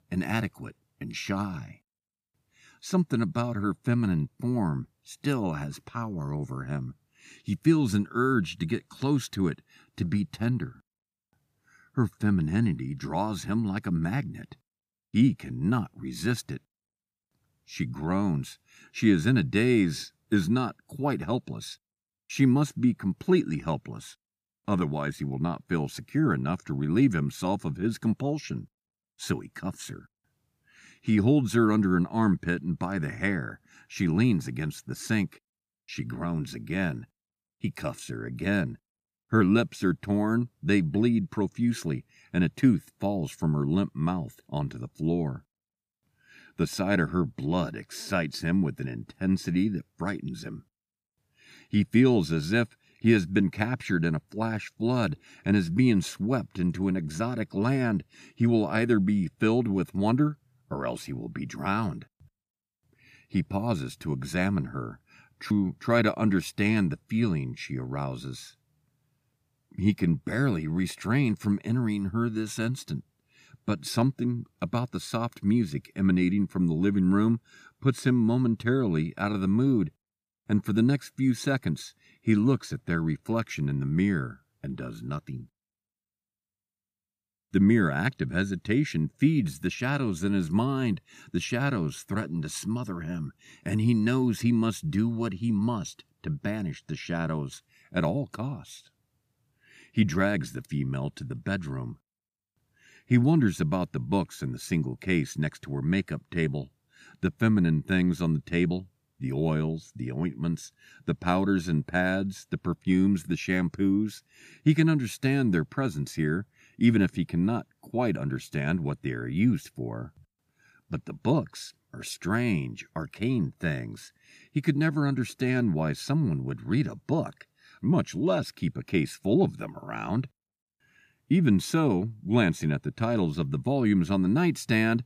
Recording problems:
none

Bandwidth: 15 kHz